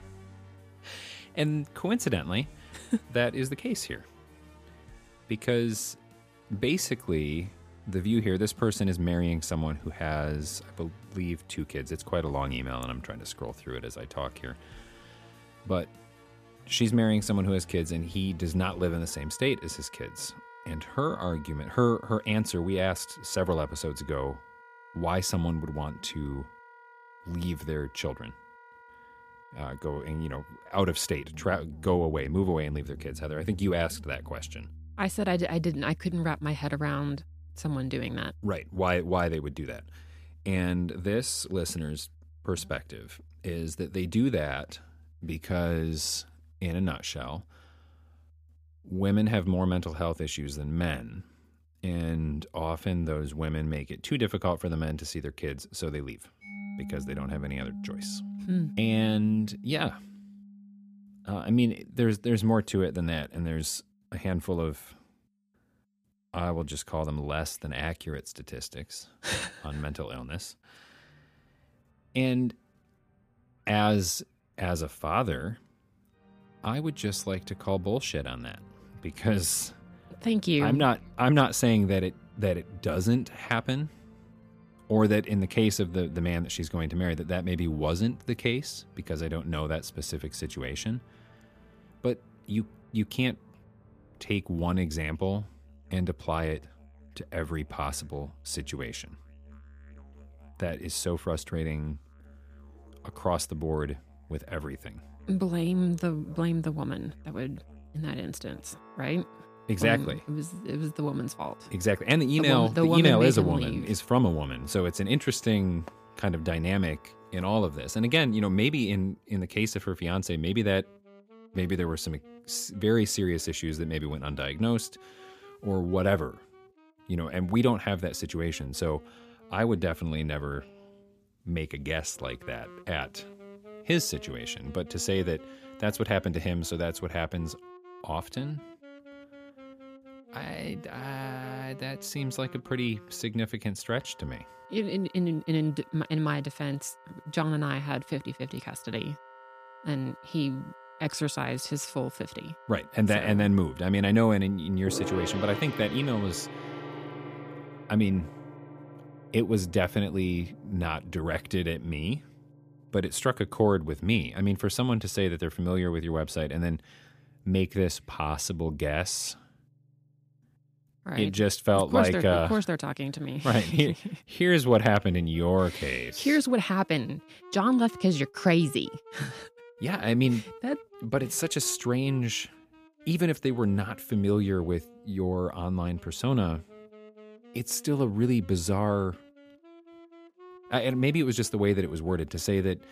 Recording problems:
background music; noticeable; throughout; 20 dB below the speech

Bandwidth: 15 kHz